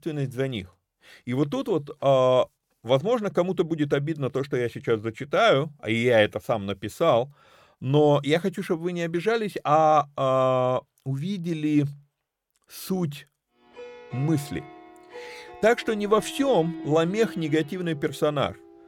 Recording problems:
background music; noticeable; from 14 s on; 15 dB below the speech

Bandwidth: 17 kHz